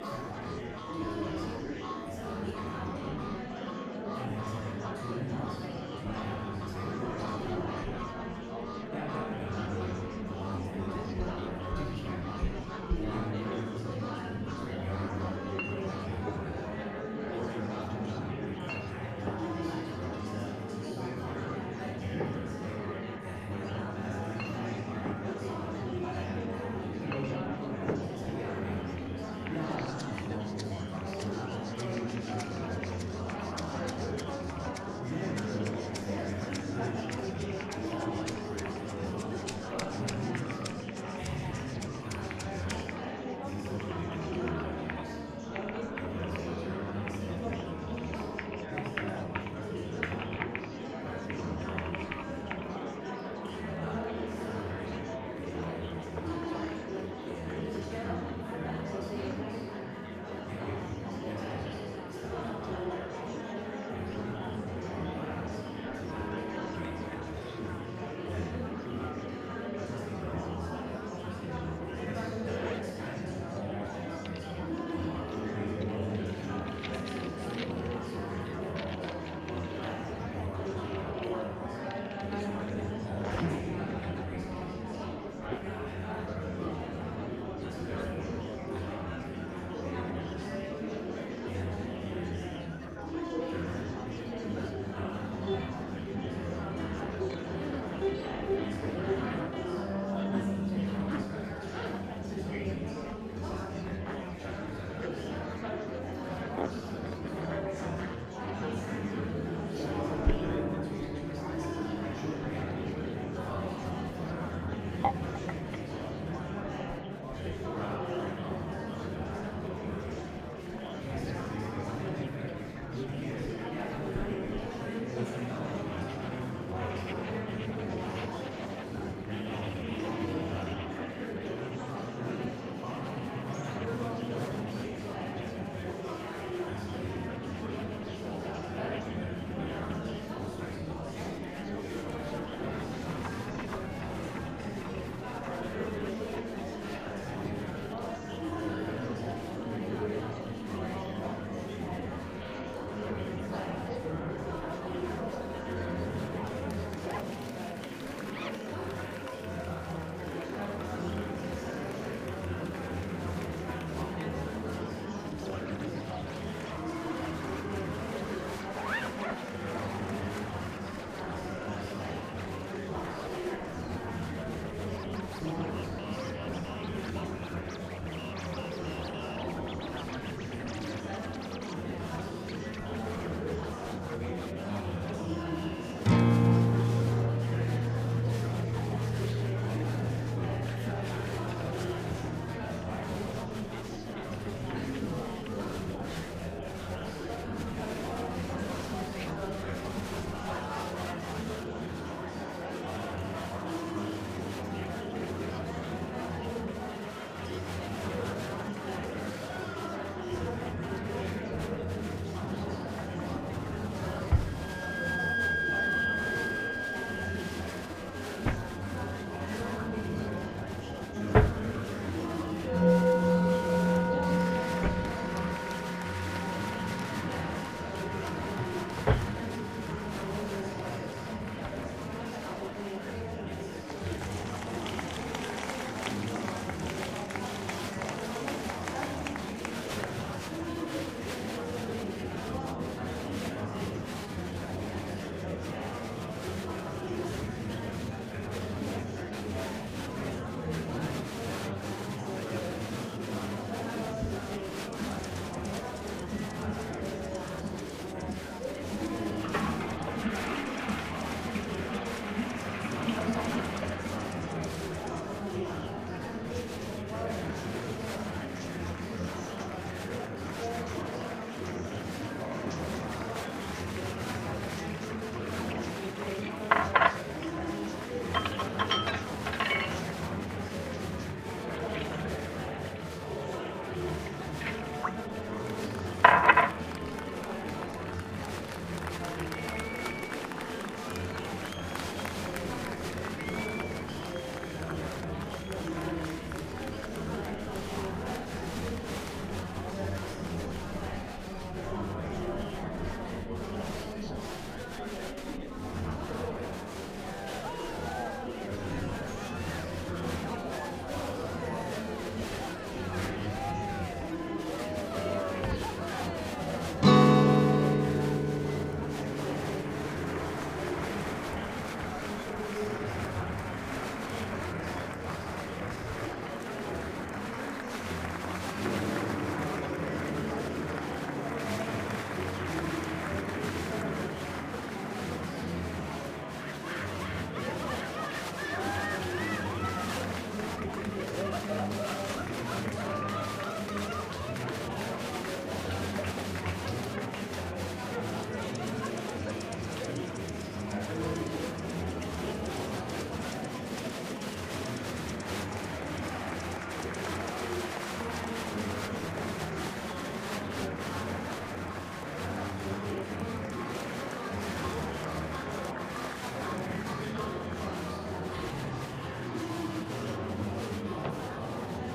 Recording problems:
room echo; strong; dies away in 2 s
off-mic speech; far
household noises; very loud; throughout; 1 dB above the speech
background music; very loud; throughout; 2 dB above the speech
murmuring crowd; very loud; throughout; 3 dB above the speech

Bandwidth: 15 kHz